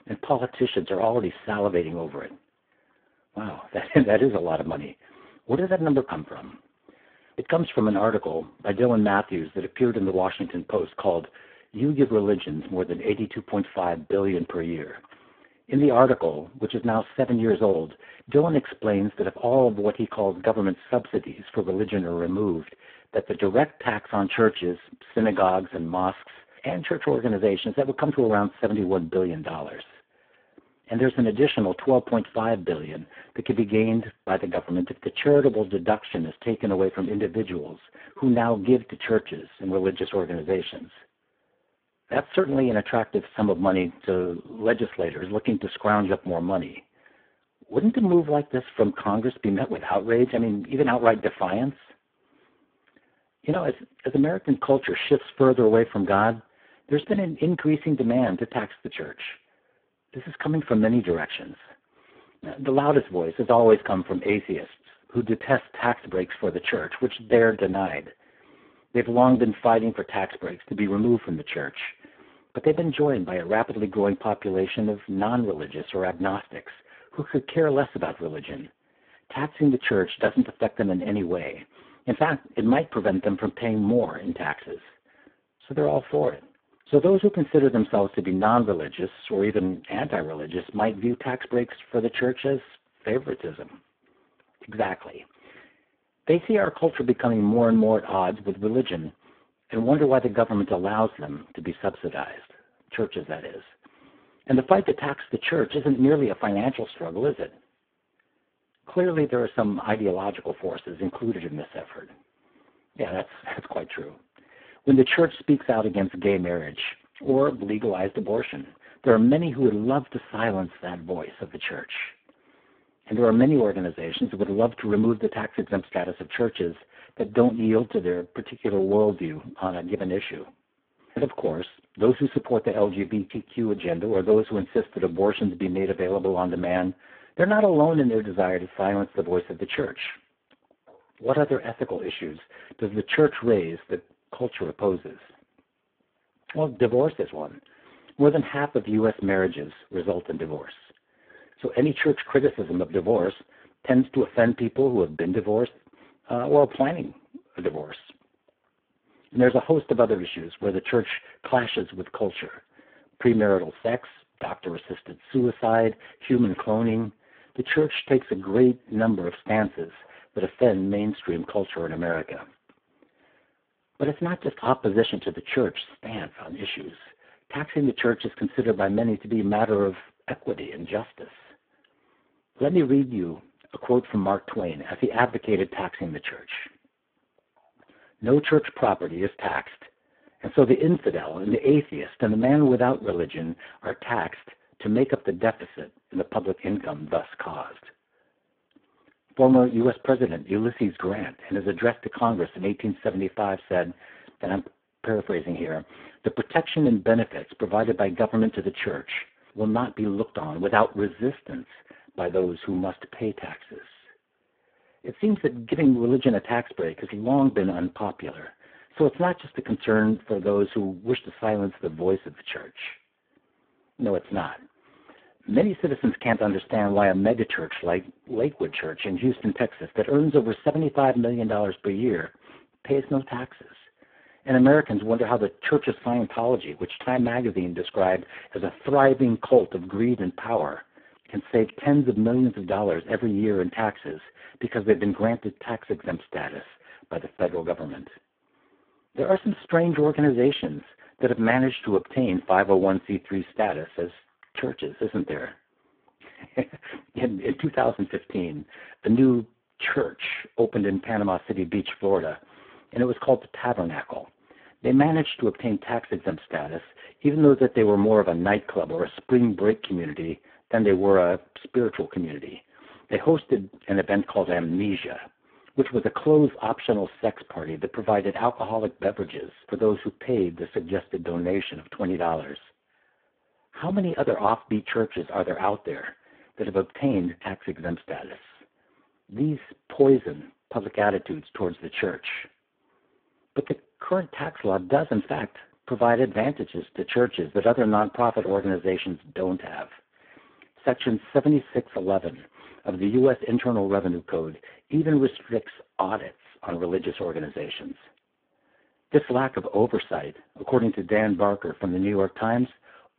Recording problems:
phone-call audio; poor line

